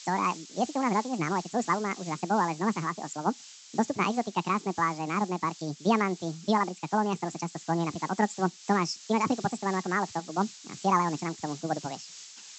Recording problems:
wrong speed and pitch; too fast and too high; 1.7 times normal speed
high frequencies cut off; noticeable; nothing above 8 kHz
hiss; noticeable; throughout; 15 dB below the speech

